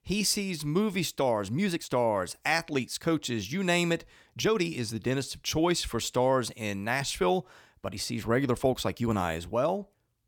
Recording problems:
uneven, jittery; strongly; from 1 to 9 s

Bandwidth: 18.5 kHz